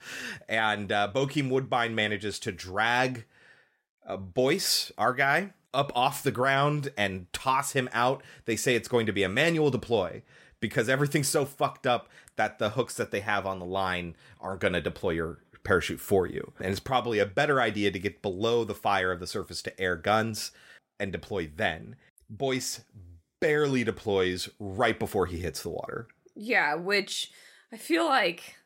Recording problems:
none

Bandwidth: 16 kHz